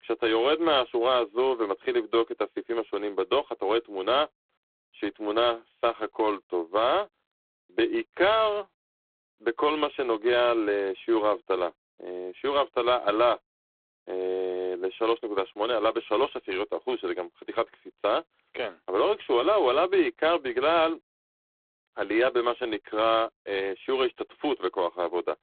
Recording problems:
phone-call audio; poor line

